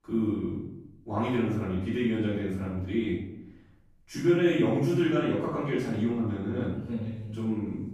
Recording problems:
off-mic speech; far
room echo; noticeable; dies away in 0.7 s

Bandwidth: 15 kHz